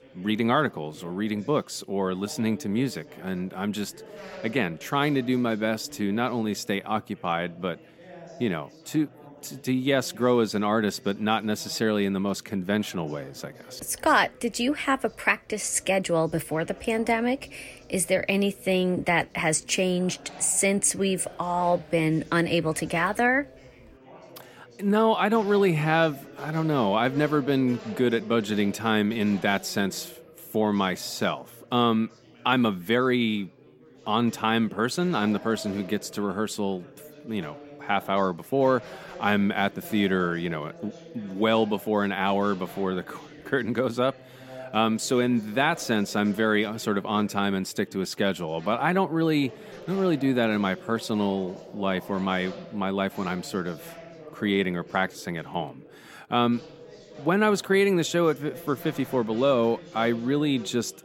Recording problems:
chatter from many people; faint; throughout; 20 dB below the speech

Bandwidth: 16 kHz